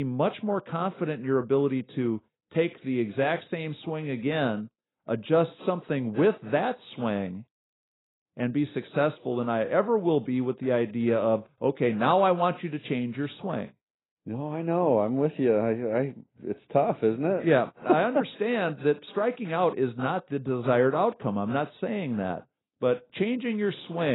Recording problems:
garbled, watery; badly; nothing above 4 kHz
abrupt cut into speech; at the start and the end

